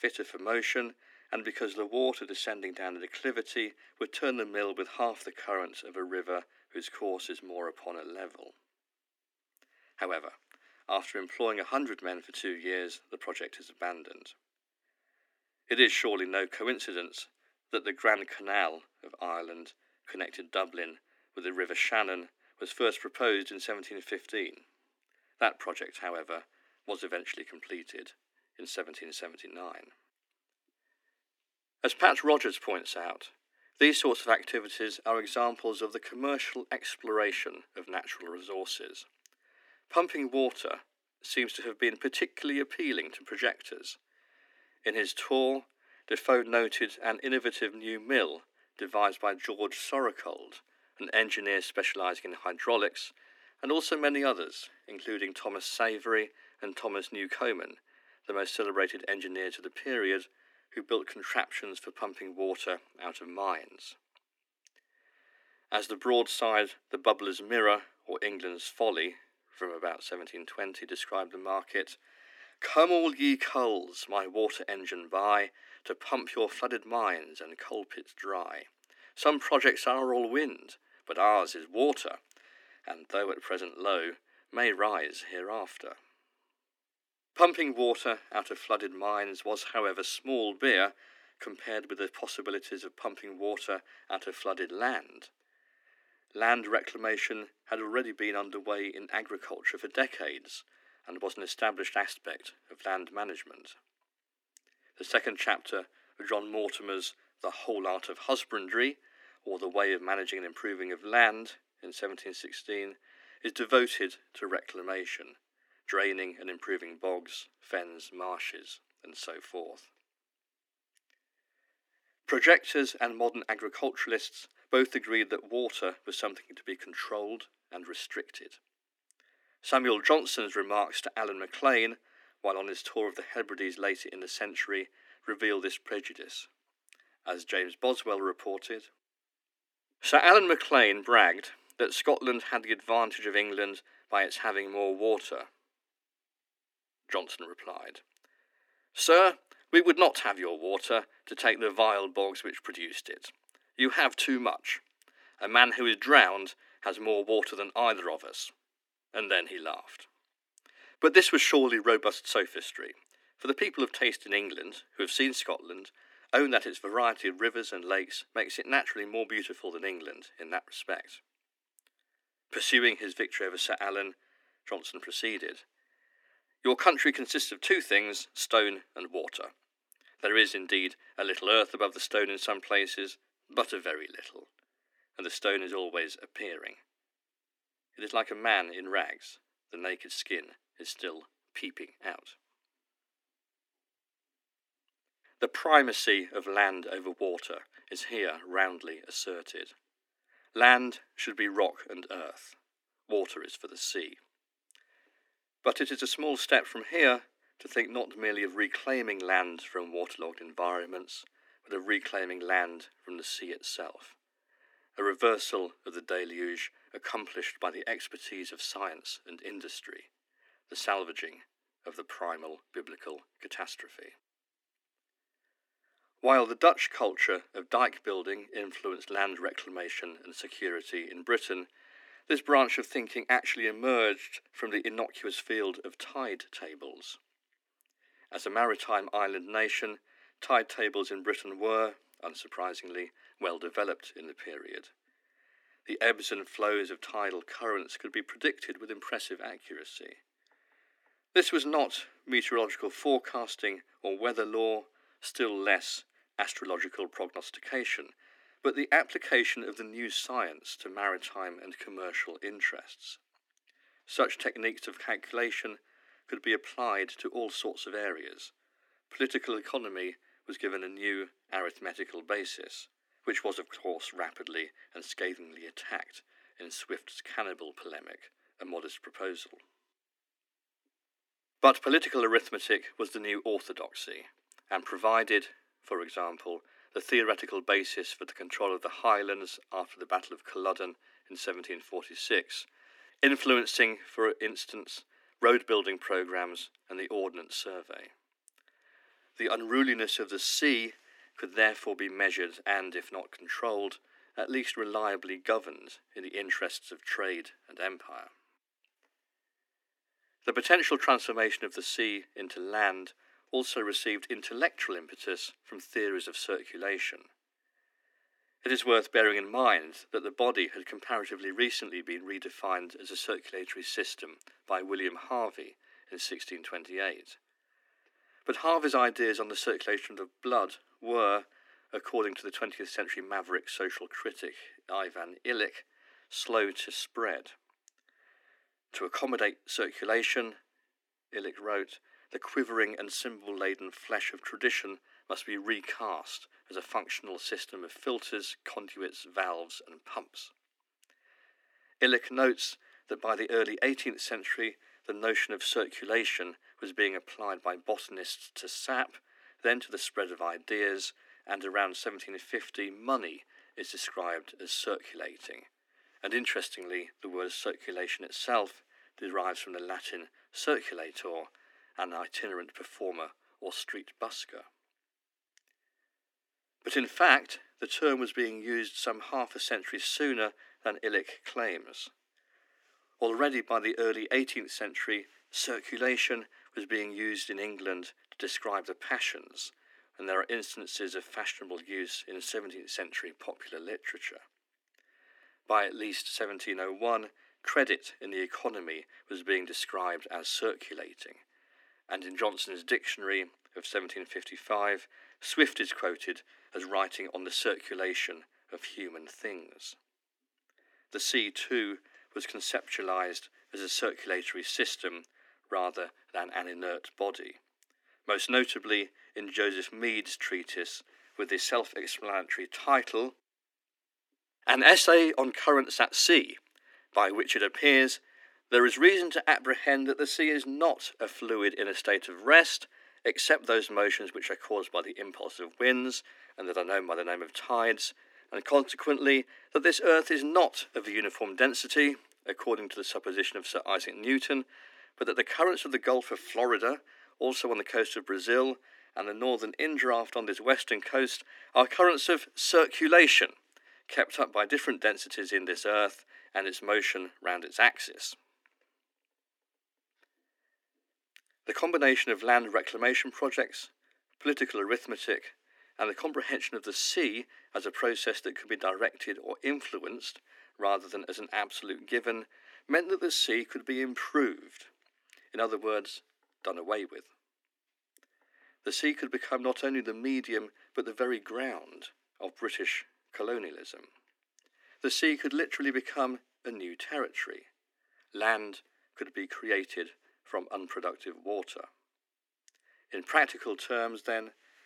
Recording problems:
thin; somewhat; fading below 250 Hz

